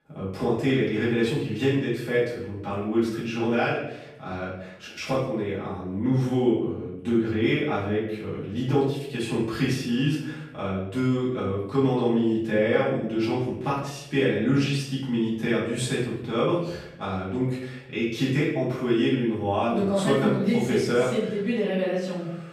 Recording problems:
off-mic speech; far
room echo; noticeable; dies away in 0.7 s

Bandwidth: 14.5 kHz